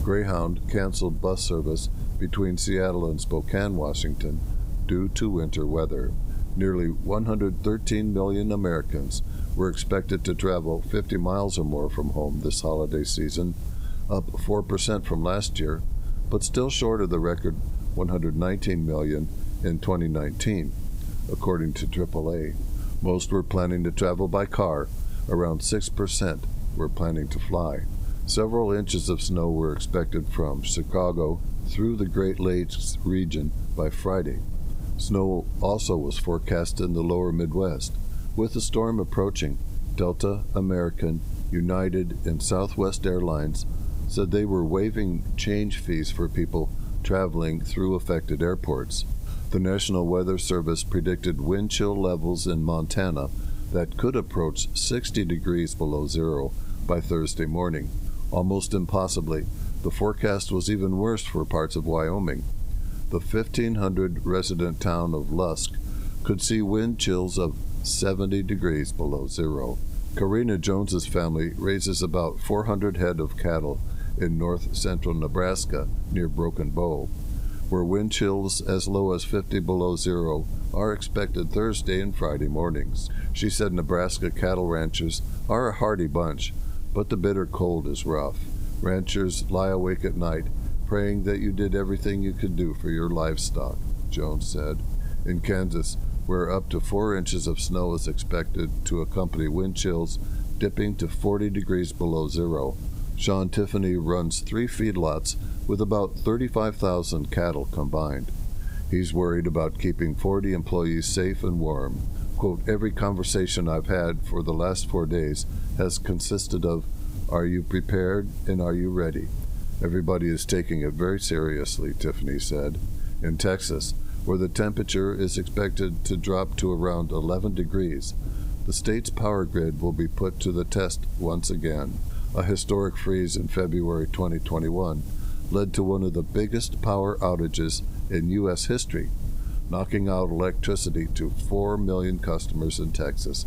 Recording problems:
squashed, flat; somewhat
hiss; faint; throughout; 25 dB below the speech
low rumble; faint; throughout; 20 dB below the speech

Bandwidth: 15.5 kHz